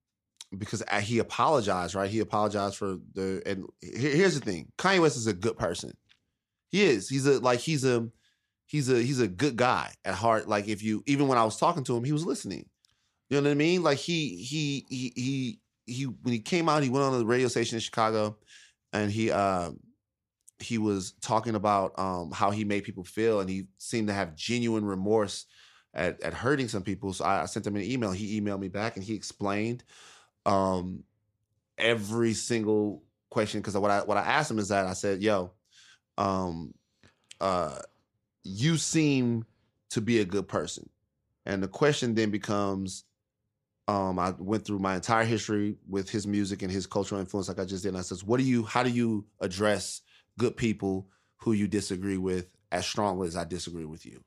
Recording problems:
none

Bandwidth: 14.5 kHz